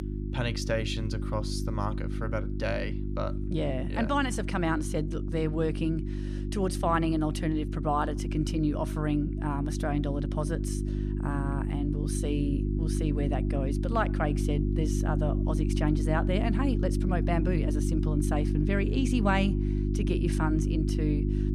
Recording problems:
electrical hum; loud; throughout; 50 Hz, 6 dB below the speech

